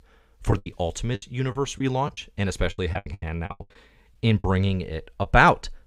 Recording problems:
choppy; very; 15% of the speech affected

